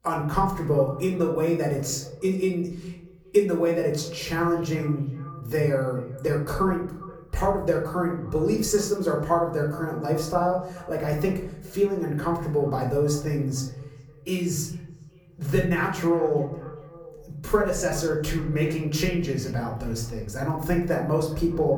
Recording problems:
off-mic speech; far
echo of what is said; faint; throughout; 410 ms later, 20 dB below the speech
room echo; slight; dies away in 0.6 s

